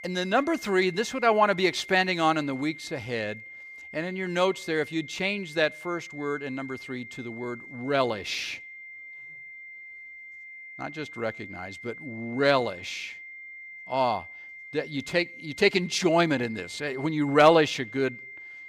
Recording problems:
high-pitched whine; noticeable; throughout; 2 kHz, 15 dB below the speech

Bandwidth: 15 kHz